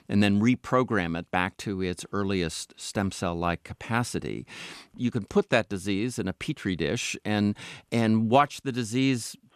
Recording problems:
none

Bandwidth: 14 kHz